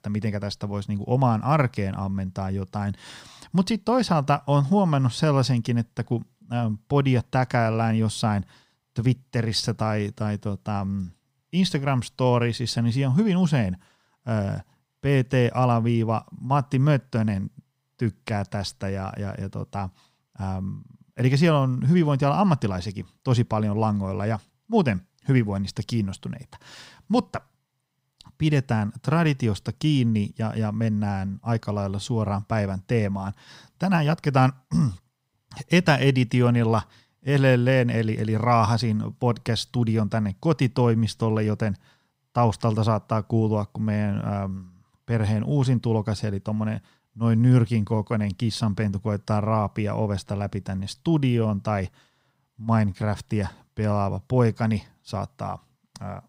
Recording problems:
none

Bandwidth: 15.5 kHz